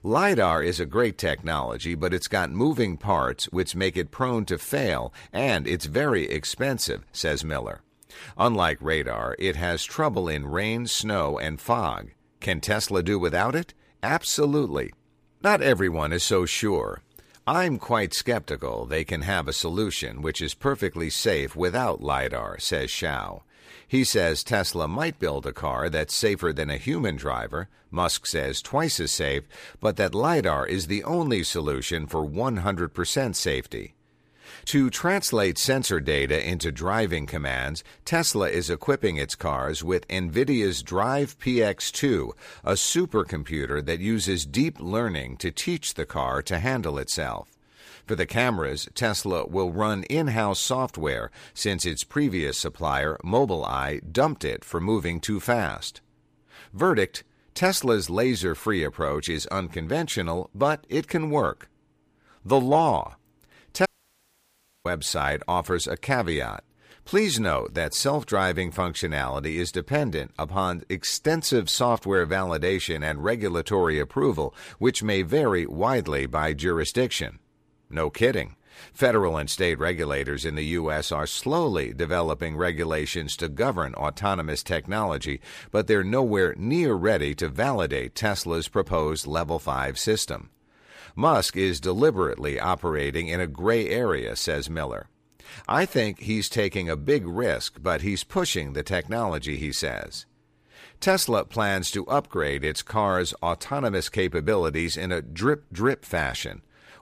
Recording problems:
audio cutting out; at 1:04 for 1 s

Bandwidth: 15 kHz